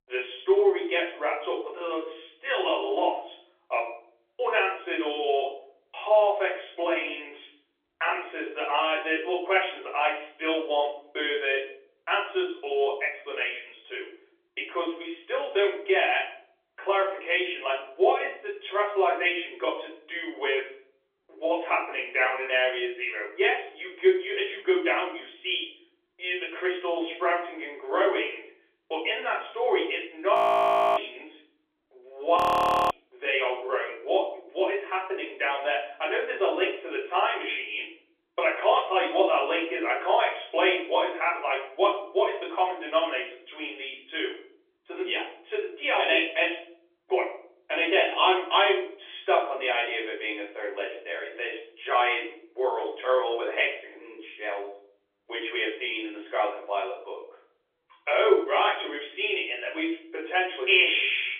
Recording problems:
off-mic speech; far
room echo; slight; dies away in 0.5 s
phone-call audio; nothing above 3.5 kHz
audio freezing; at 30 s for 0.5 s and at 32 s for 0.5 s

